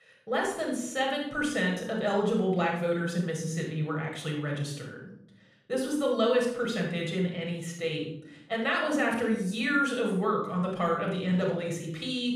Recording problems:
off-mic speech; far
room echo; noticeable; dies away in 0.7 s

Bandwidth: 14.5 kHz